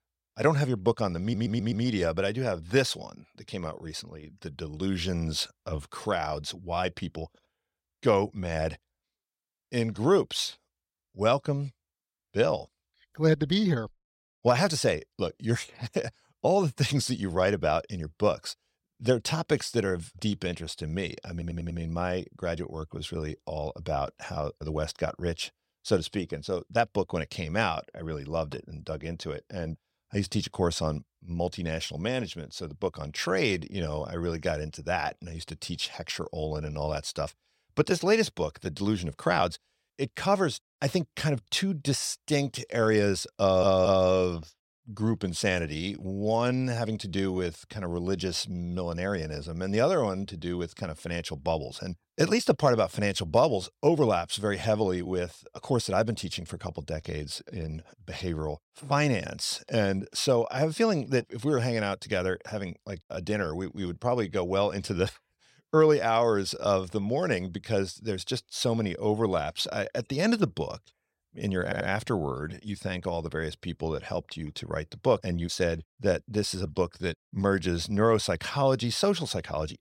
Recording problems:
audio stuttering; 4 times, first at 1 s

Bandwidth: 16.5 kHz